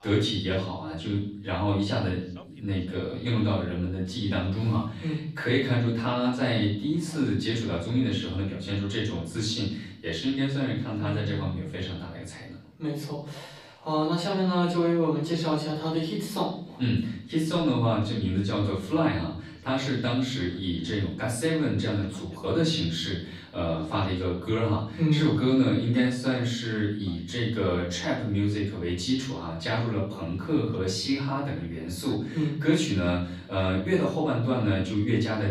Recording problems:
off-mic speech; far
room echo; noticeable; dies away in 0.7 s
voice in the background; faint; throughout; 30 dB below the speech

